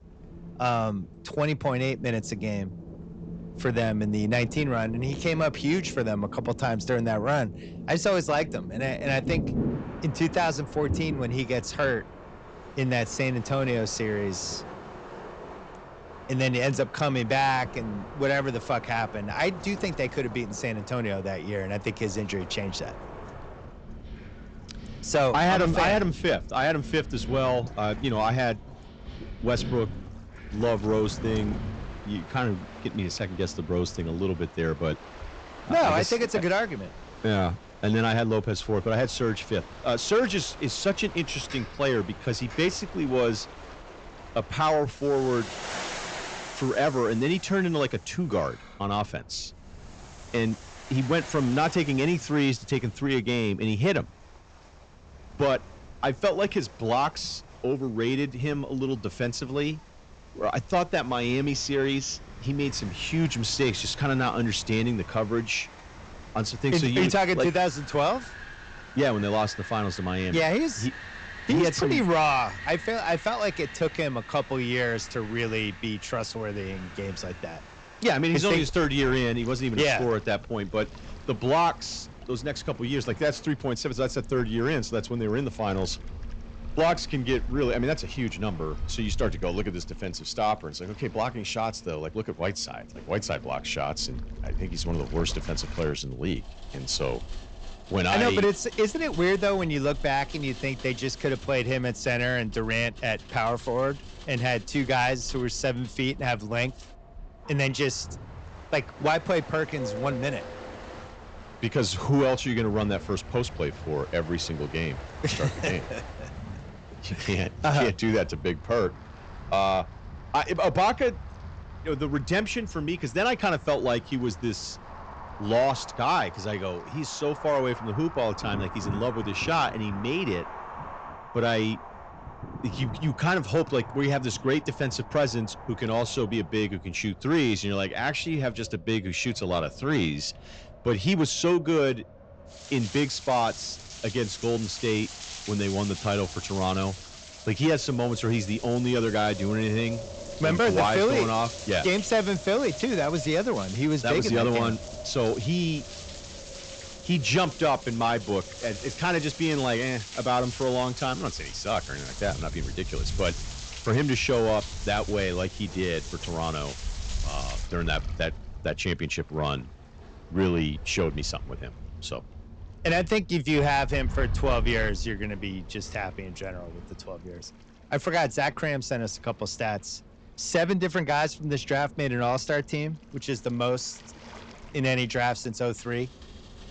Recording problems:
high frequencies cut off; noticeable; nothing above 8 kHz
distortion; slight; 10 dB below the speech
rain or running water; noticeable; throughout; 15 dB below the speech
wind in the background; noticeable; throughout; 15 dB below the speech

